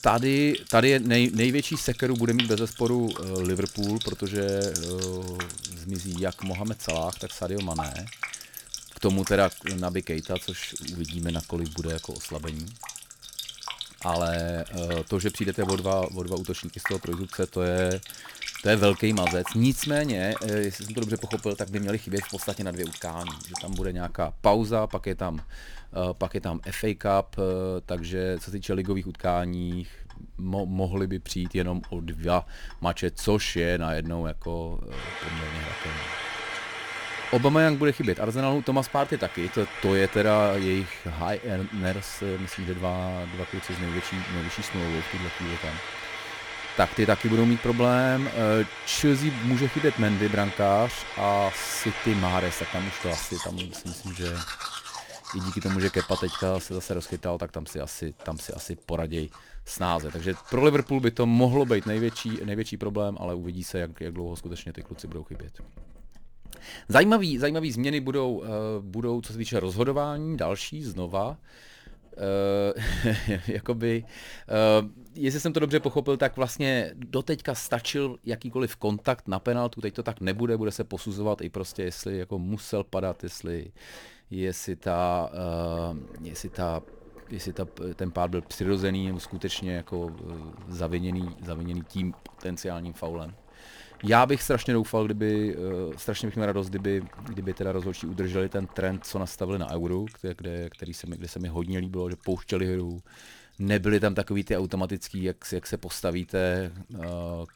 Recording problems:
household noises; loud; throughout; 9 dB below the speech

